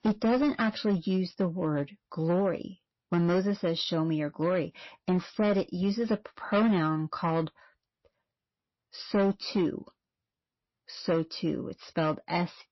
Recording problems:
distortion; slight; 6% of the sound clipped
garbled, watery; slightly; nothing above 5.5 kHz

